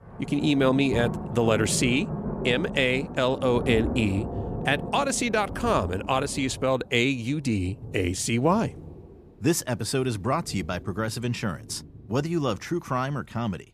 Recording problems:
rain or running water; loud; throughout; 9 dB below the speech

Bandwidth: 14.5 kHz